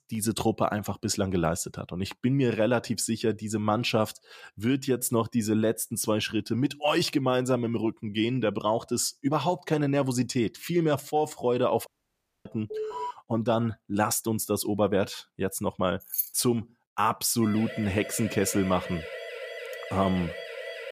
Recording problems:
audio cutting out; at 12 s for 0.5 s
alarm; noticeable; at 13 s; peak 6 dB below the speech
jangling keys; noticeable; at 16 s; peak 2 dB below the speech
siren; noticeable; from 17 s on; peak 10 dB below the speech

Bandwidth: 15 kHz